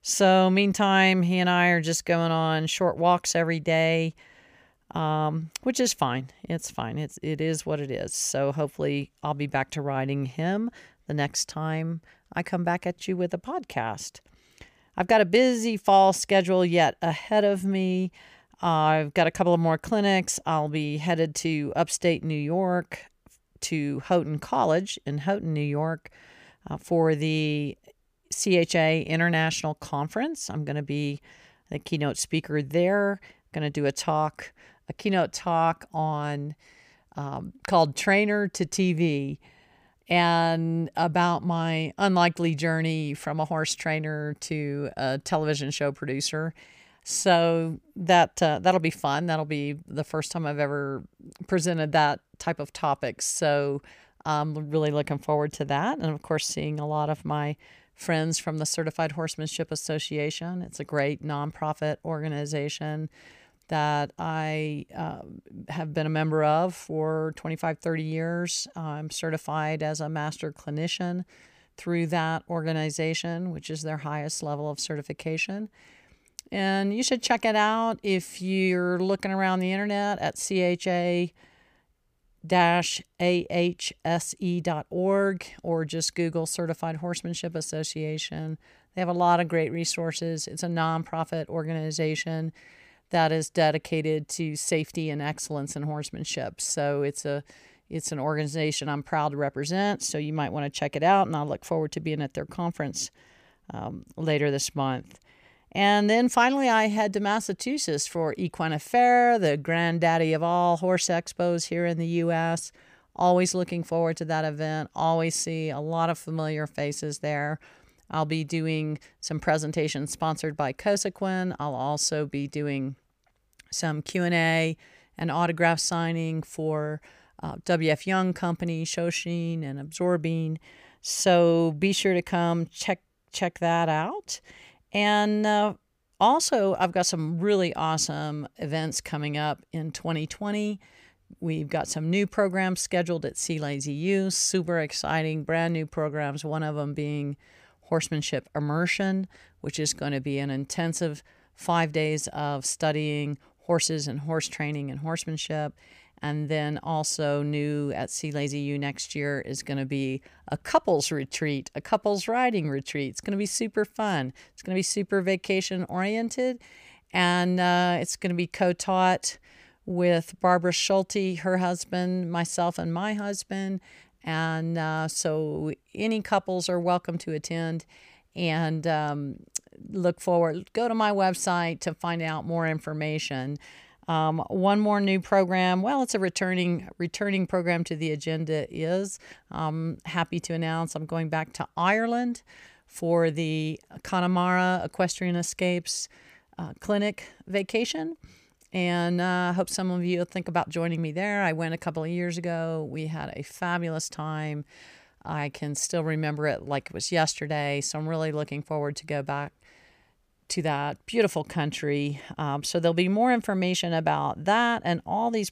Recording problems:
none

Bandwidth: 15 kHz